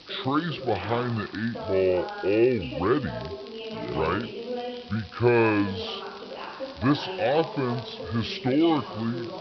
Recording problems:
wrong speed and pitch; too slow and too low; 0.7 times normal speed
high frequencies cut off; noticeable; nothing above 5.5 kHz
voice in the background; noticeable; throughout; 10 dB below the speech
hiss; faint; throughout; 20 dB below the speech
crackle, like an old record; faint; 25 dB below the speech

